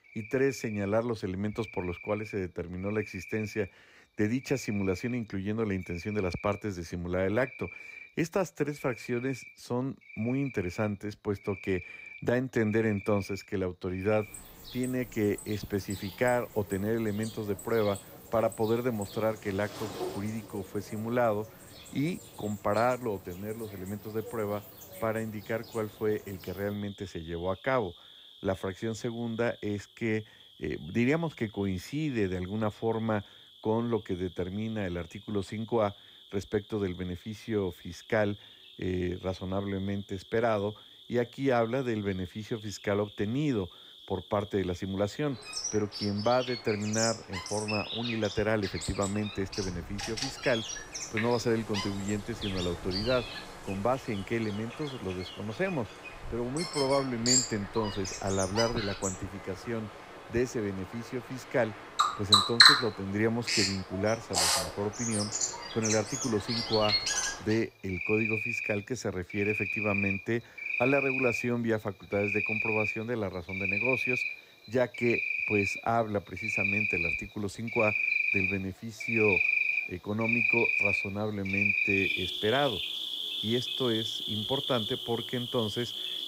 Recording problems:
animal sounds; very loud; throughout; 2 dB above the speech

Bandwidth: 15.5 kHz